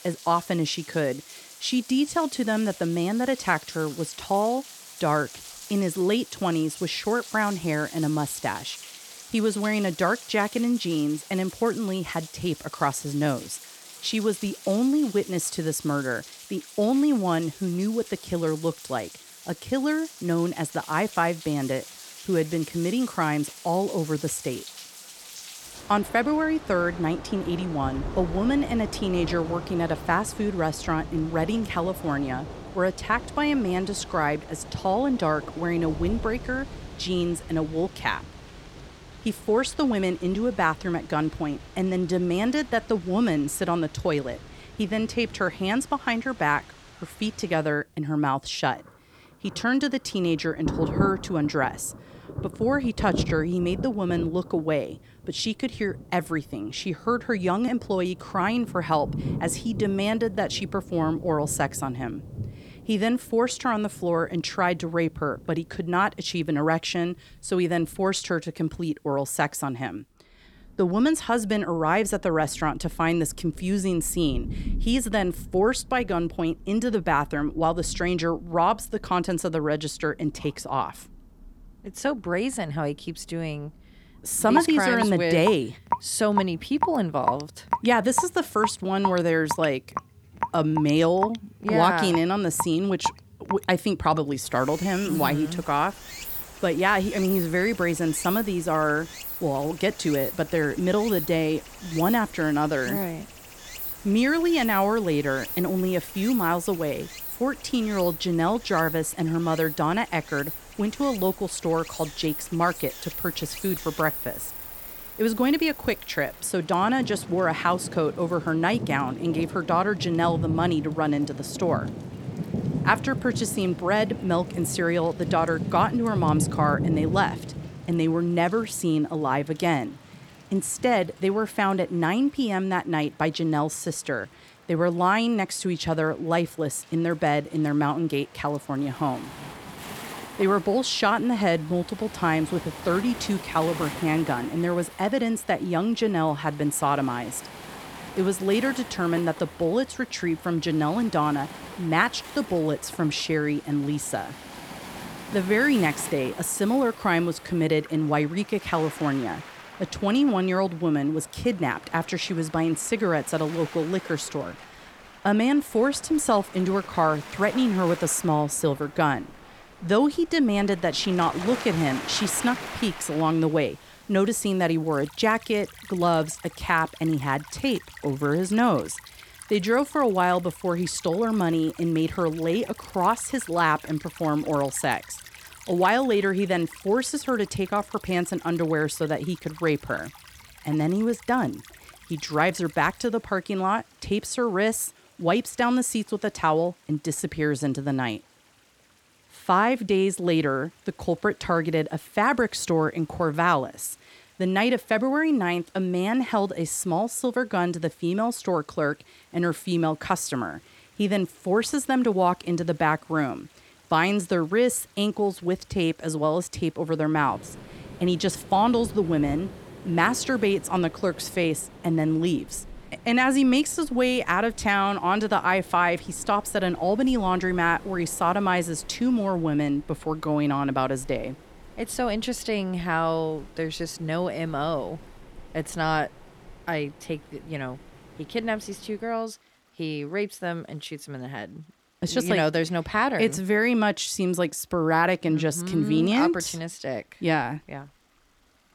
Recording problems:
rain or running water; noticeable; throughout; 10 dB below the speech

